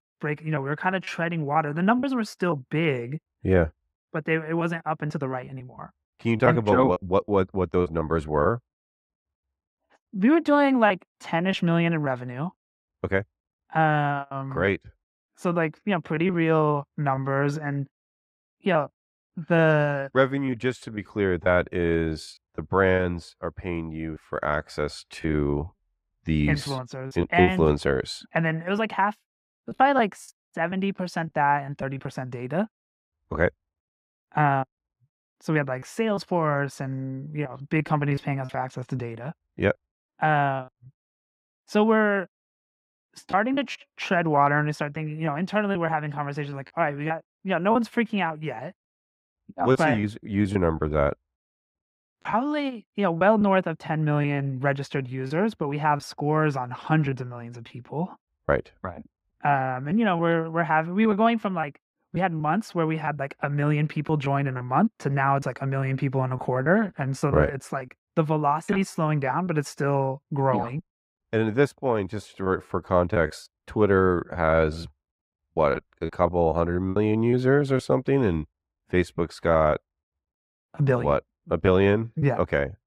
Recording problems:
muffled; slightly; fading above 3 kHz
choppy; very; 6% of the speech affected

